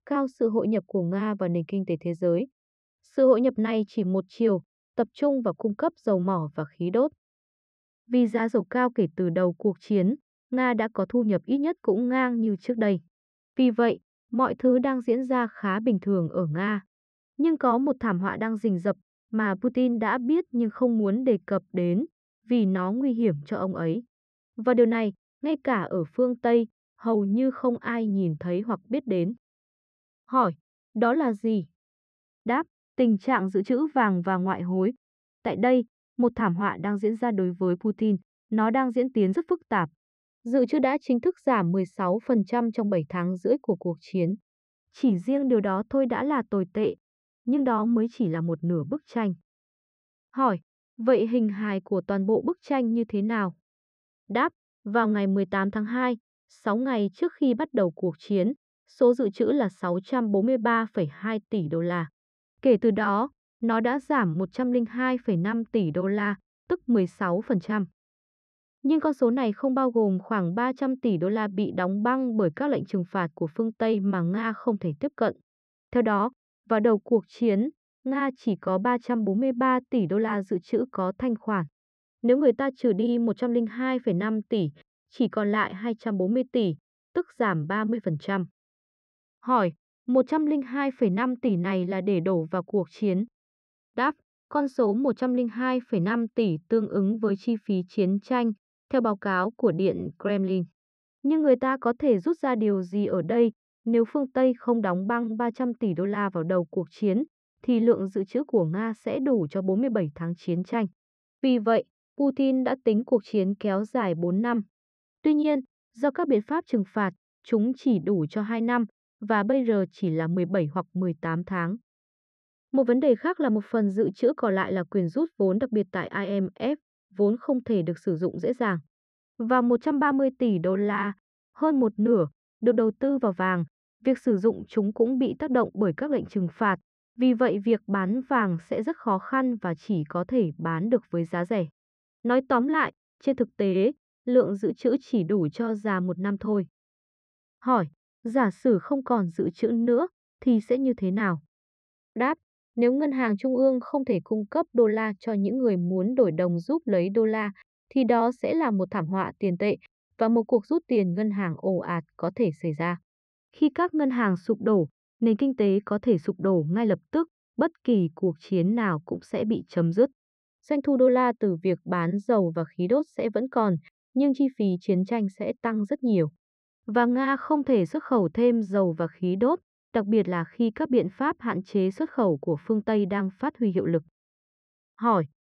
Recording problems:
muffled; very; fading above 2 kHz

